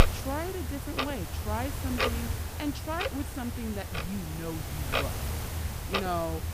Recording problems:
household noises; very loud; throughout; 3 dB above the speech

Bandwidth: 15 kHz